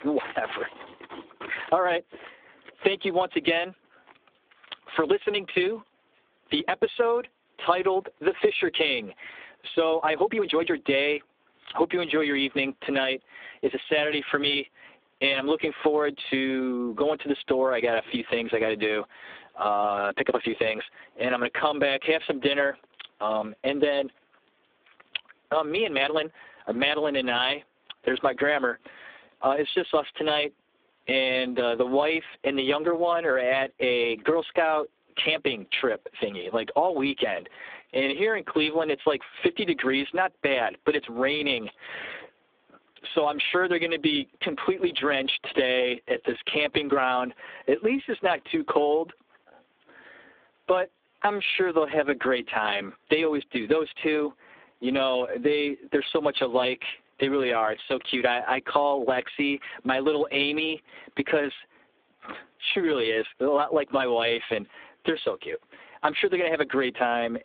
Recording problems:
phone-call audio; poor line; nothing above 3.5 kHz
squashed, flat; heavily
uneven, jittery; strongly; from 1.5 s to 1:03

